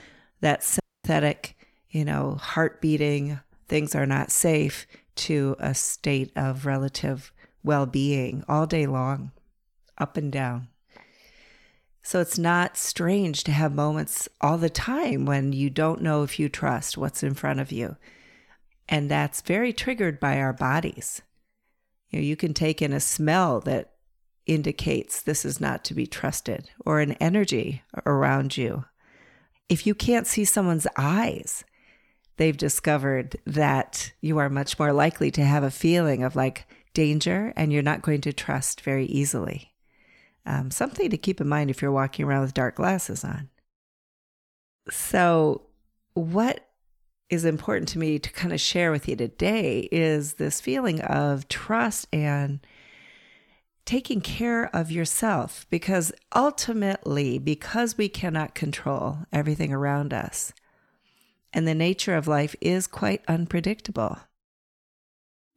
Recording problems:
audio cutting out; at 1 s

